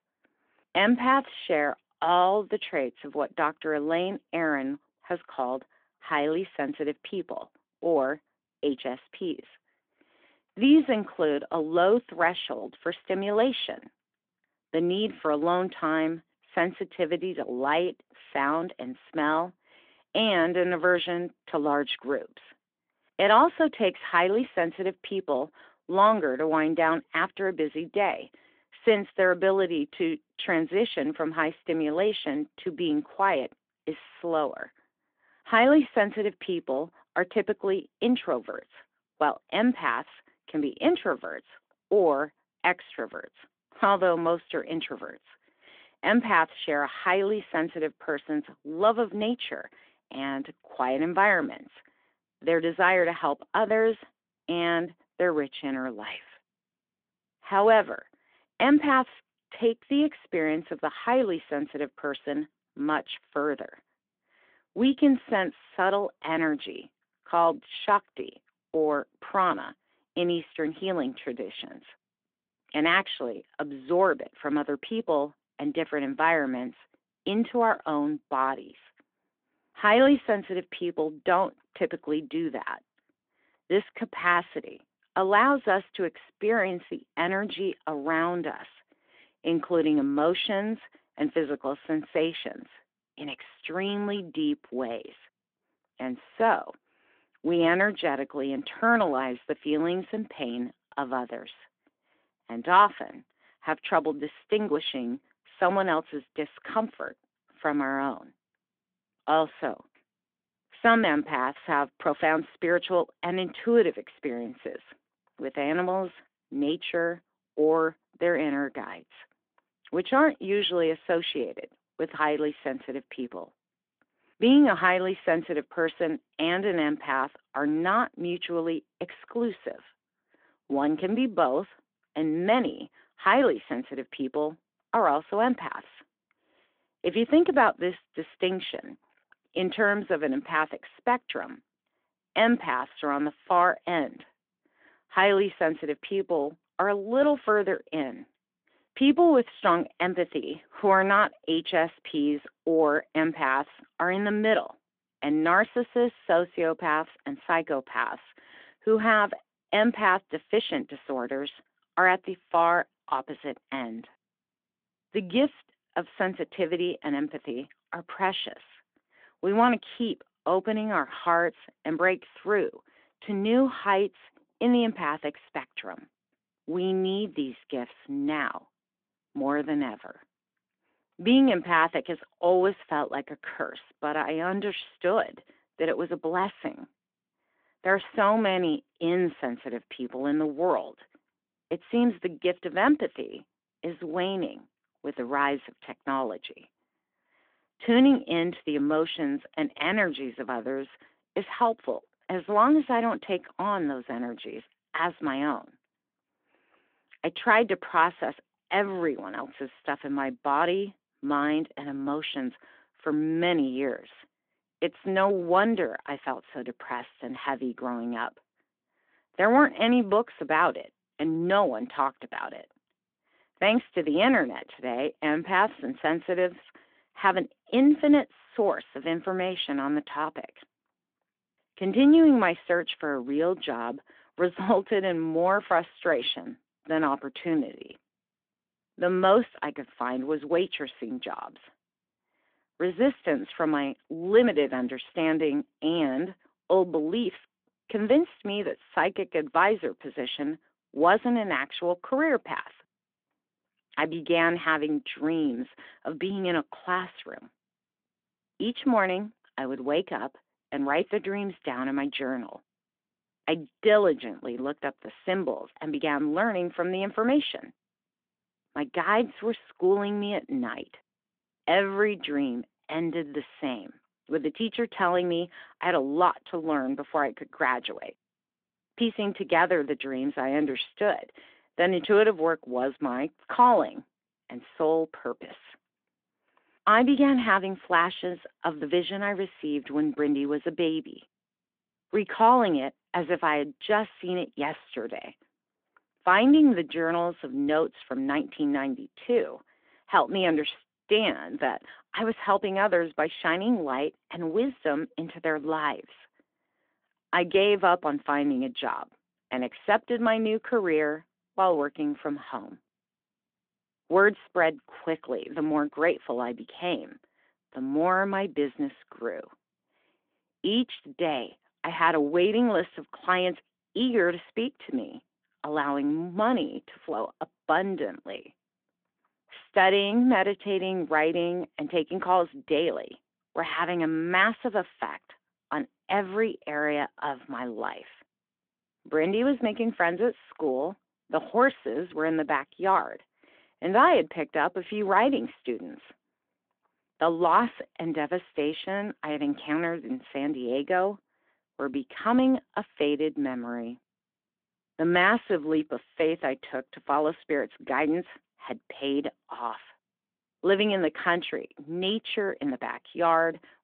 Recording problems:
phone-call audio; nothing above 3.5 kHz

